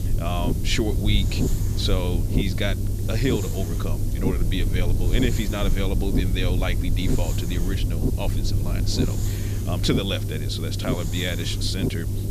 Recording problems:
low rumble; loud; throughout; 6 dB below the speech
hiss; noticeable; throughout; 10 dB below the speech

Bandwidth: 14.5 kHz